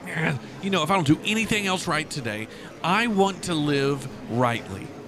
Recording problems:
murmuring crowd; noticeable; throughout; 15 dB below the speech

